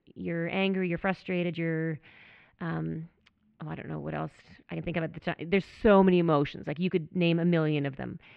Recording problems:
muffled; very; fading above 2.5 kHz
uneven, jittery; strongly; from 1 to 8 s

